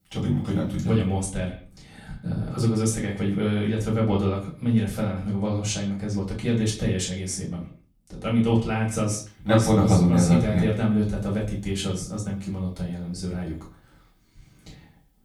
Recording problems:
off-mic speech; far
echo of what is said; faint; throughout; 110 ms later, 20 dB below the speech
room echo; slight; dies away in 0.3 s

